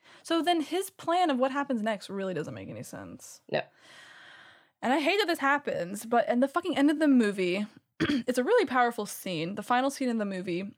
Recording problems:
uneven, jittery; strongly; from 1 to 9.5 s

